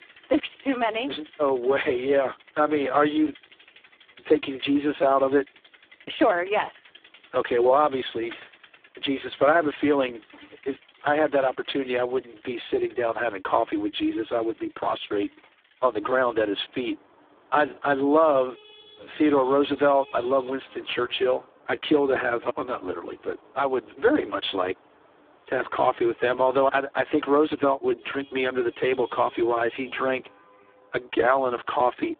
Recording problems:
phone-call audio; poor line; nothing above 3.5 kHz
traffic noise; faint; throughout; 25 dB below the speech

